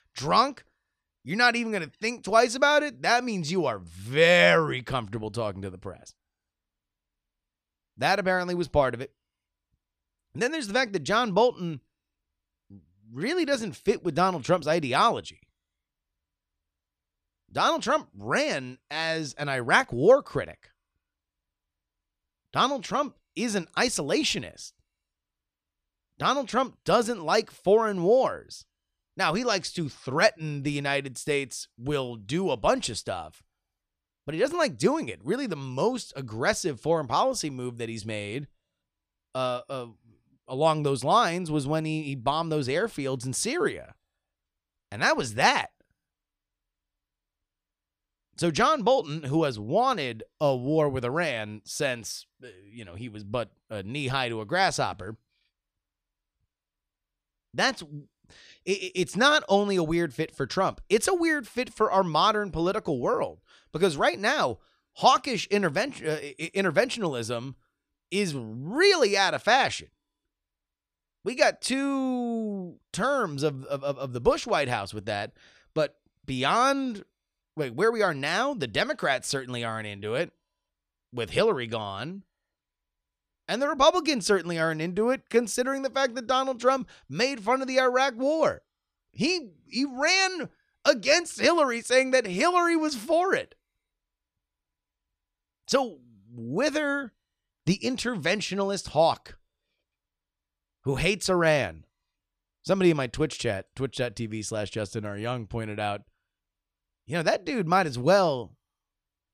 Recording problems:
none

